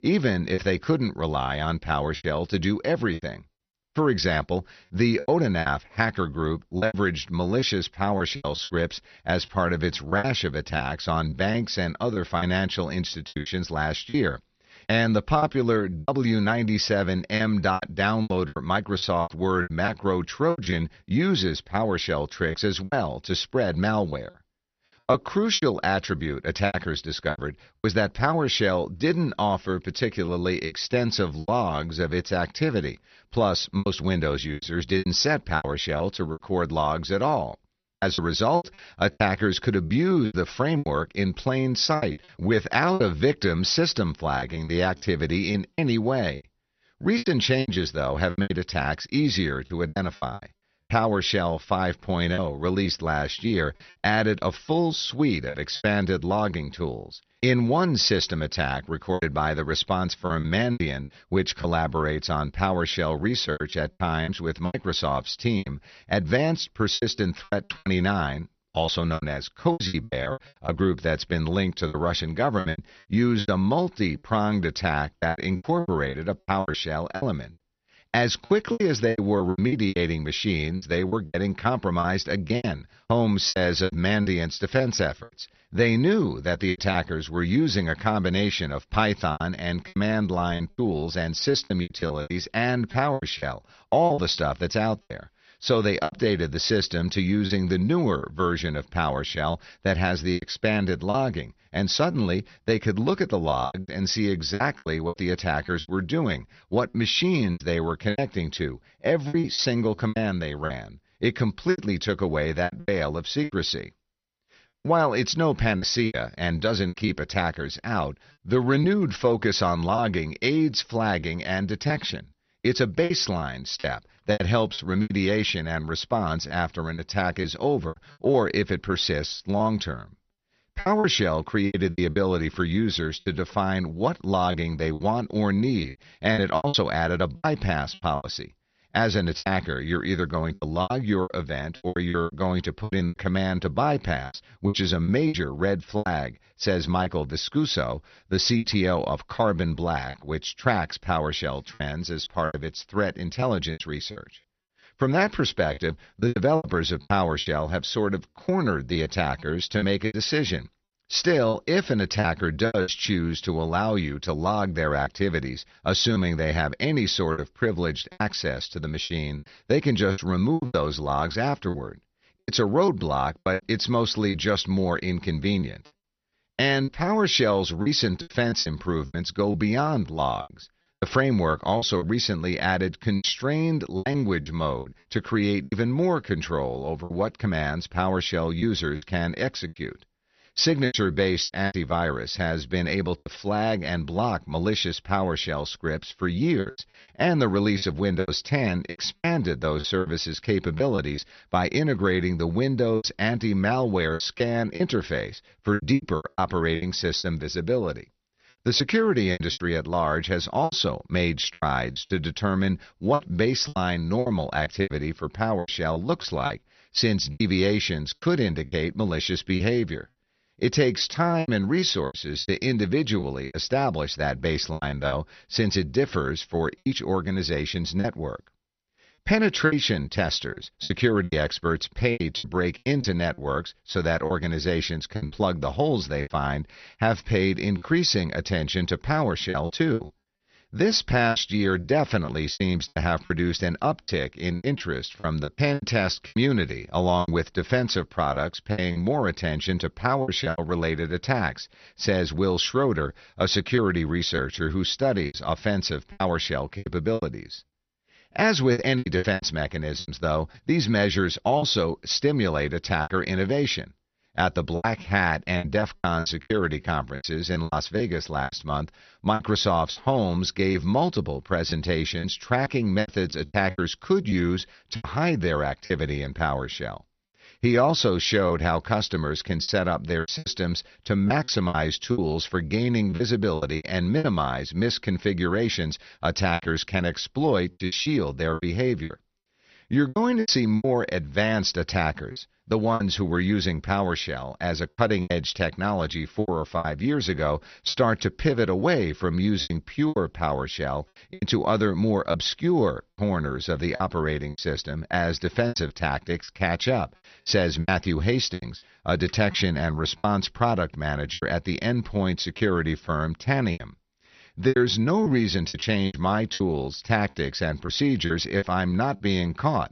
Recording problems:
garbled, watery; slightly; nothing above 6 kHz
choppy; very; 10% of the speech affected

